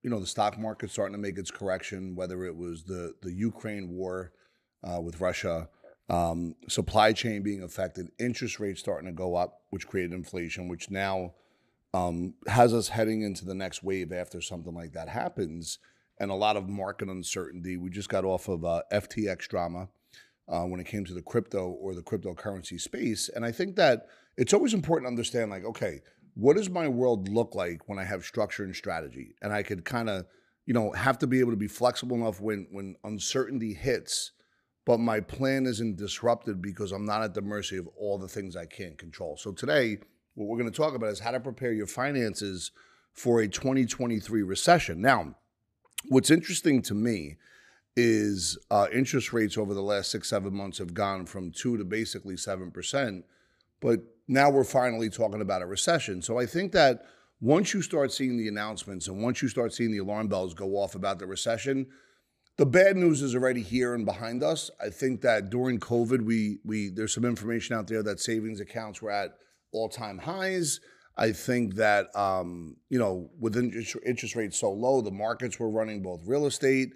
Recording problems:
none

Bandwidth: 14.5 kHz